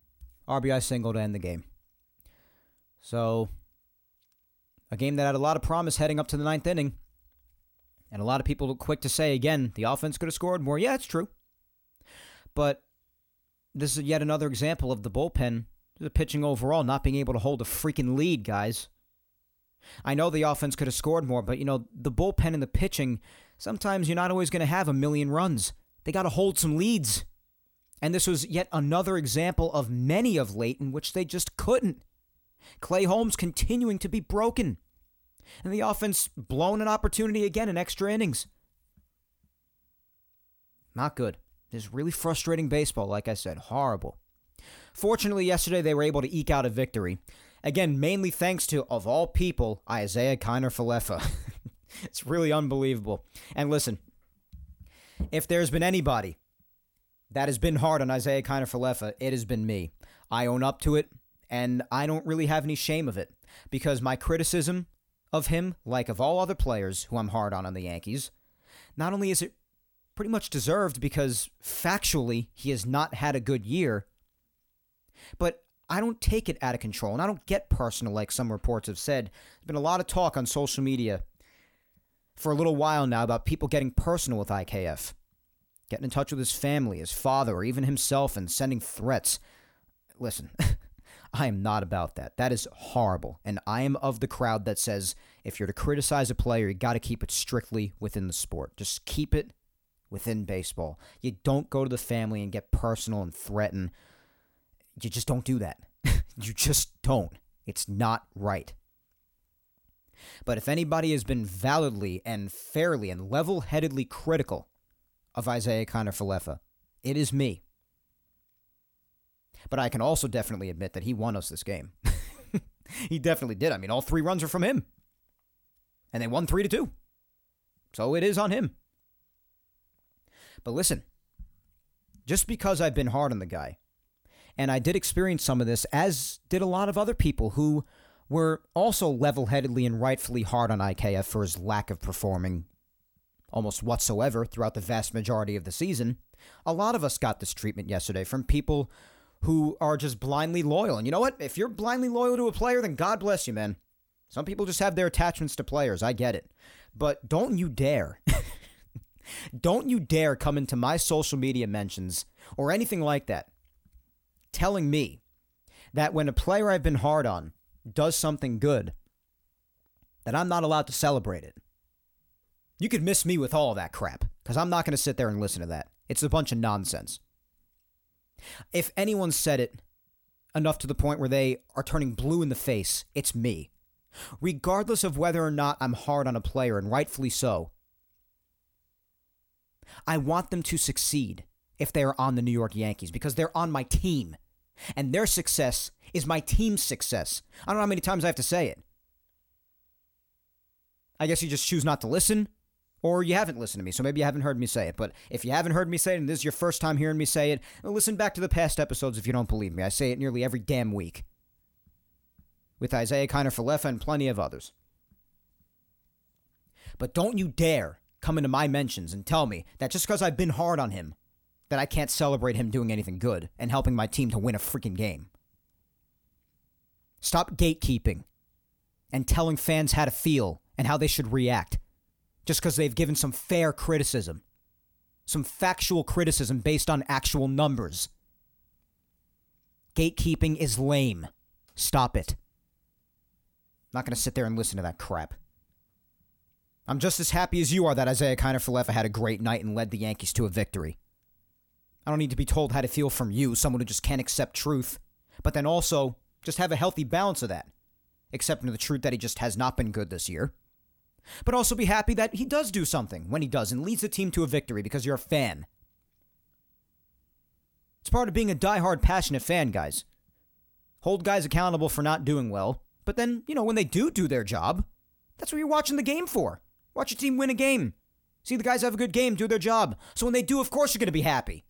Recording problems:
none

